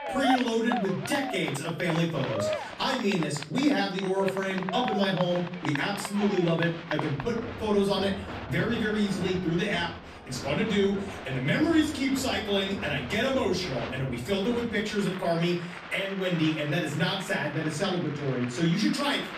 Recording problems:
off-mic speech; far
room echo; slight; dies away in 0.4 s
crowd noise; loud; throughout; 9 dB below the speech

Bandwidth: 14.5 kHz